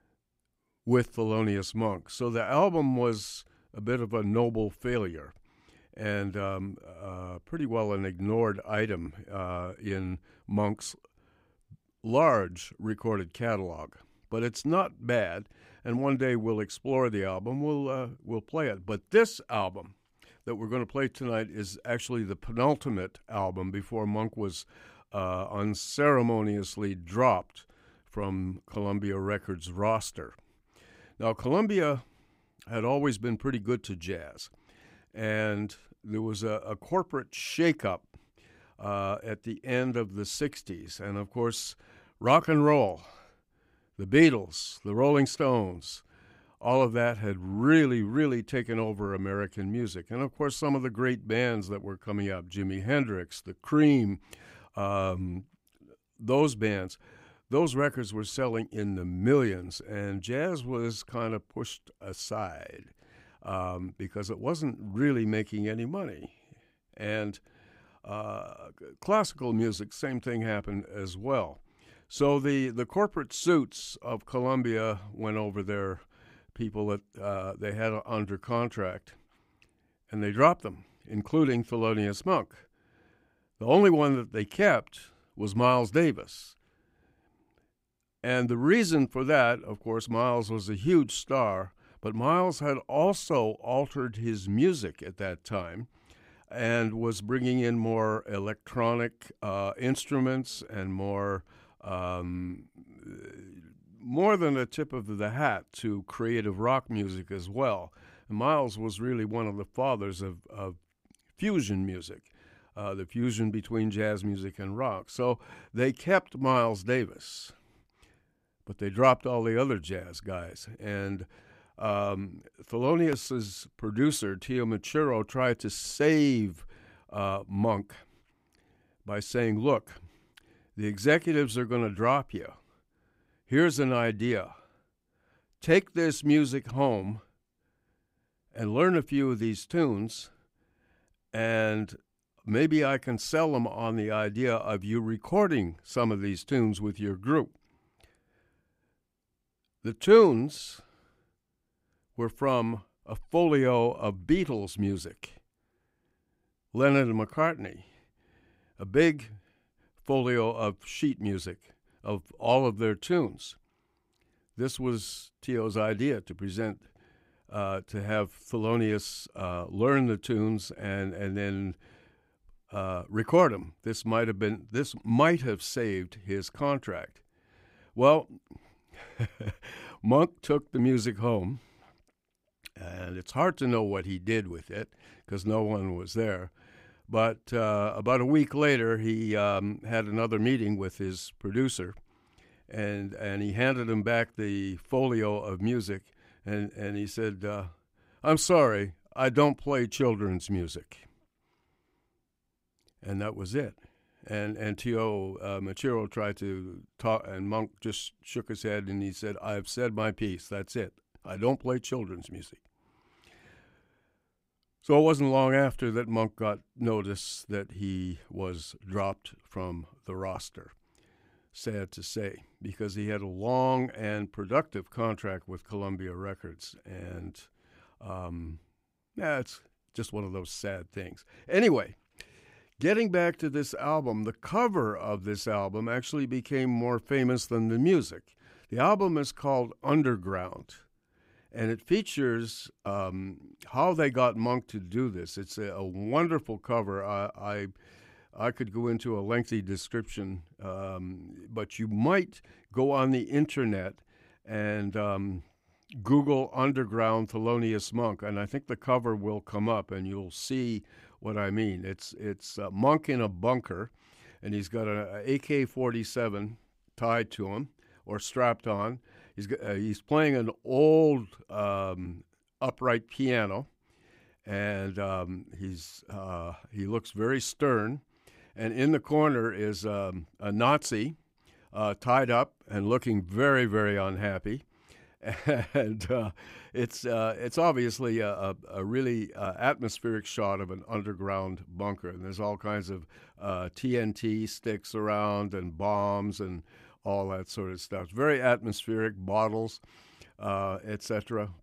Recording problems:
none

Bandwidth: 15.5 kHz